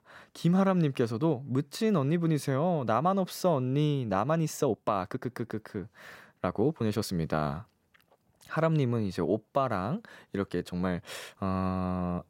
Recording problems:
uneven, jittery; strongly; from 4.5 to 11 s

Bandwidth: 16 kHz